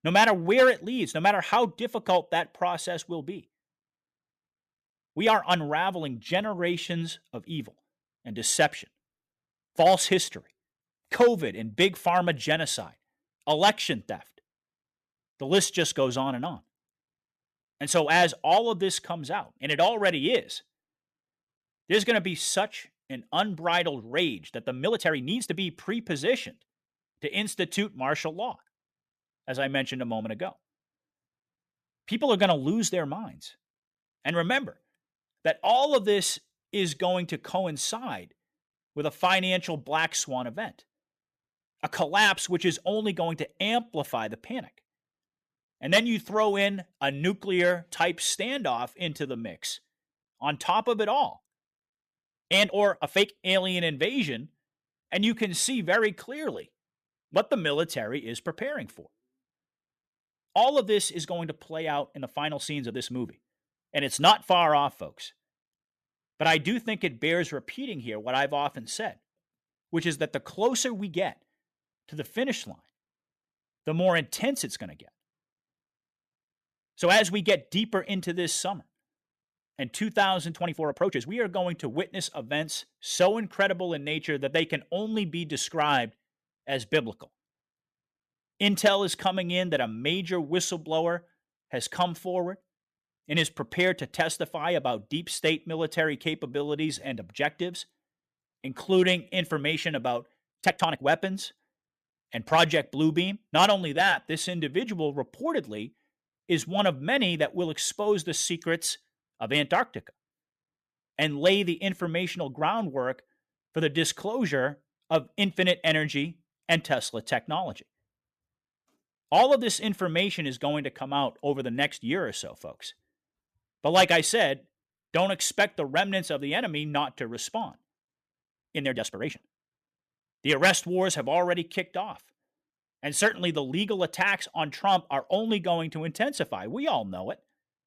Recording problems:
uneven, jittery; strongly; from 5 s to 2:10

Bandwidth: 14.5 kHz